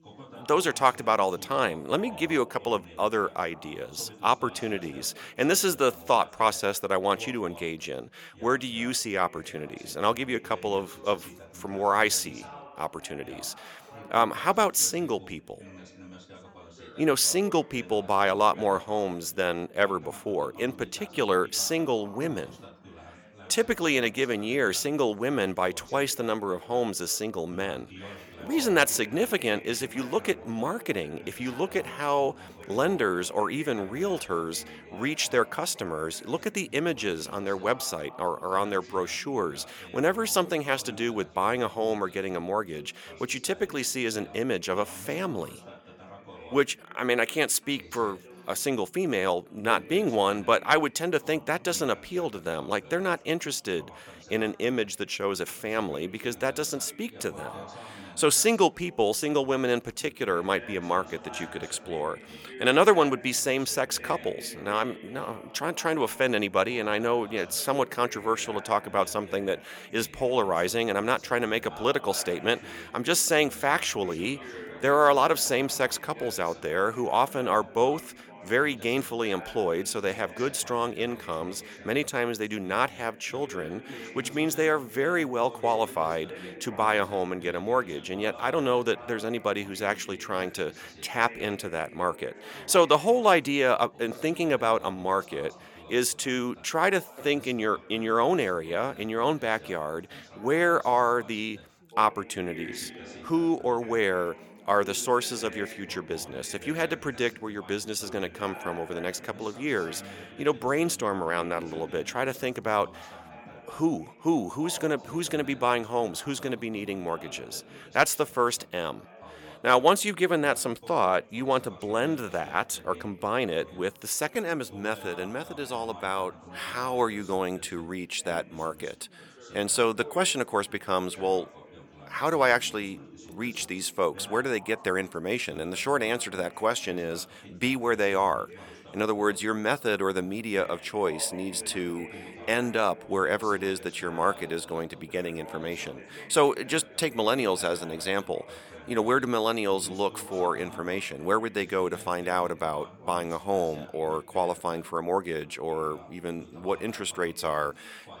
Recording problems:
background chatter; noticeable; throughout; 3 voices, 20 dB below the speech

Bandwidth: 17.5 kHz